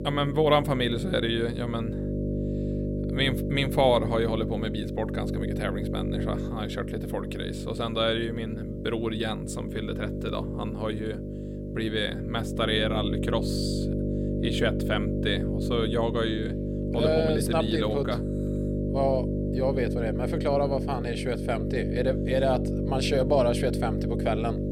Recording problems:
electrical hum; loud; throughout; 50 Hz, 7 dB below the speech

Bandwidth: 16 kHz